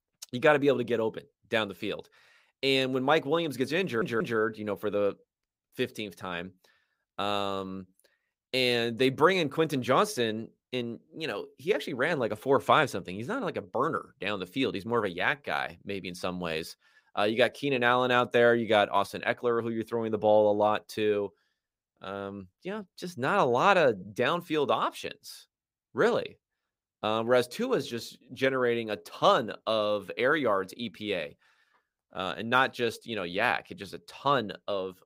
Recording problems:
audio stuttering; at 4 s

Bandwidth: 15.5 kHz